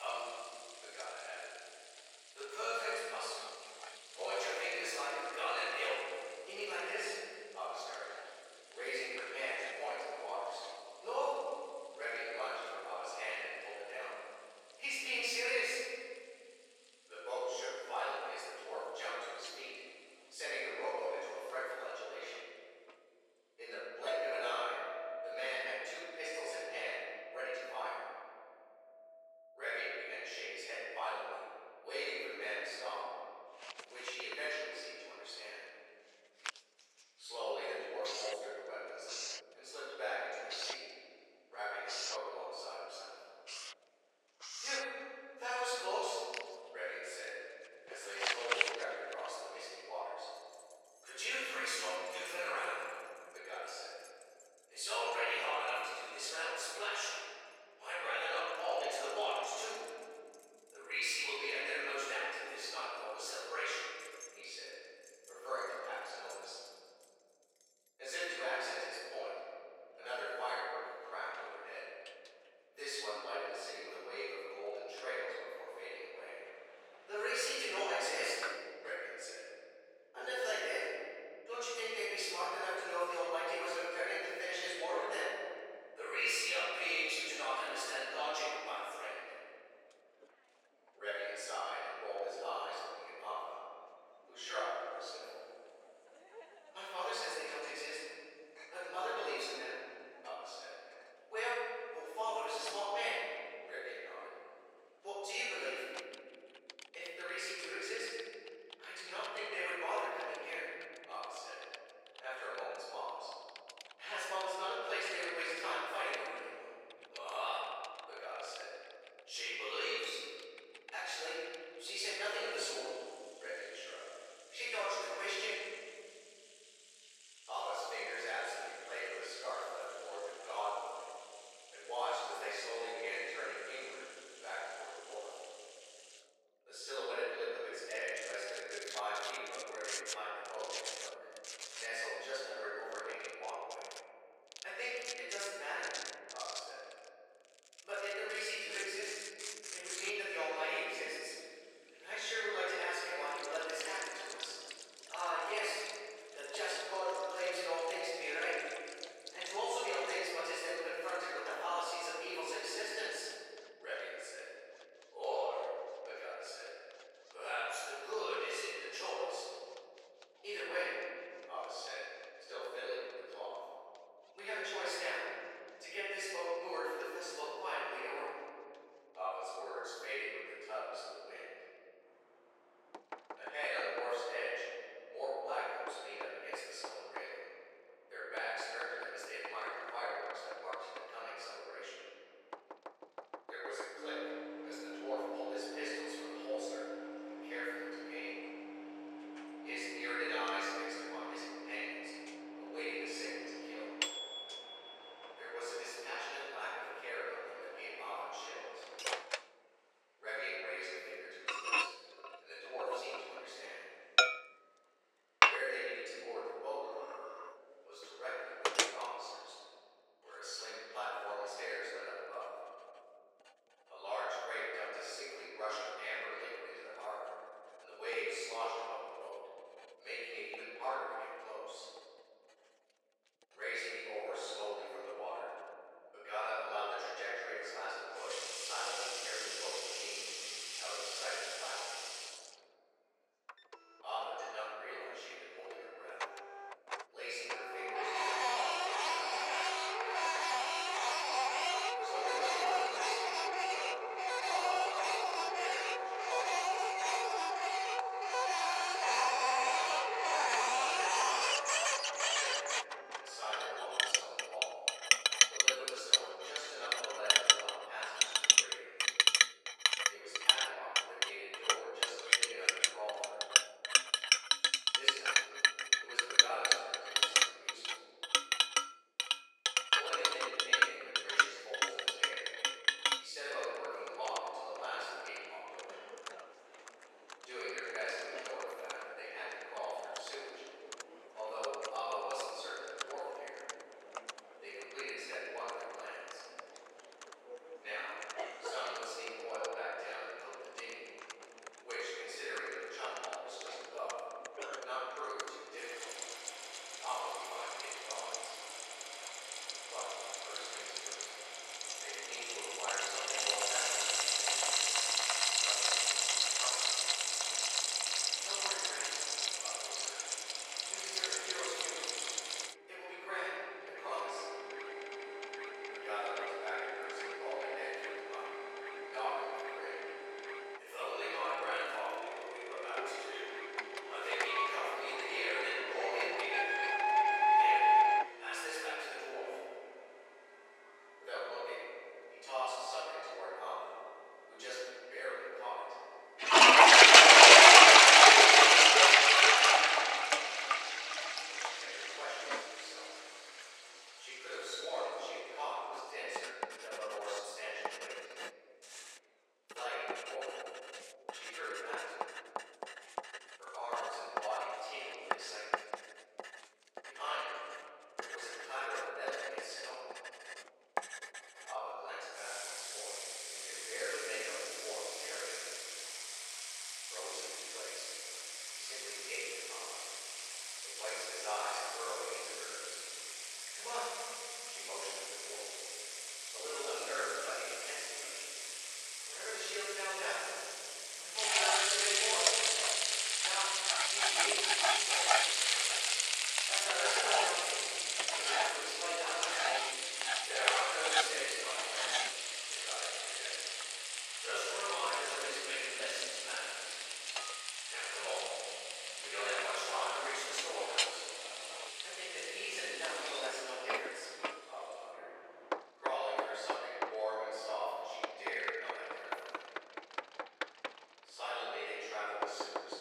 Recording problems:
room echo; strong; dies away in 2.7 s
off-mic speech; far
thin; very; fading below 450 Hz
household noises; very loud; throughout; 10 dB above the speech
abrupt cut into speech; at the start

